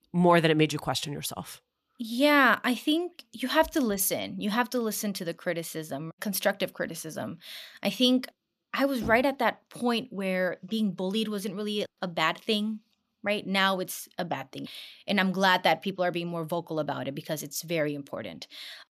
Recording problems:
none

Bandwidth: 14.5 kHz